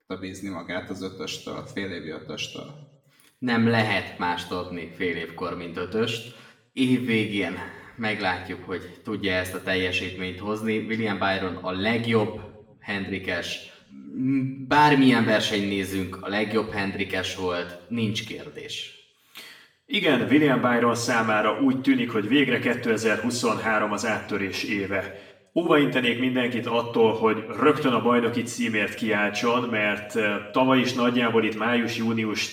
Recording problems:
off-mic speech; far
room echo; slight; dies away in 0.7 s

